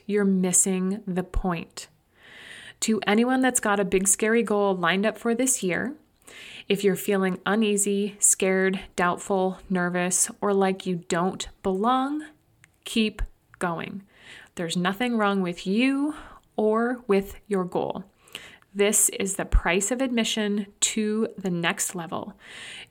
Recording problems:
none

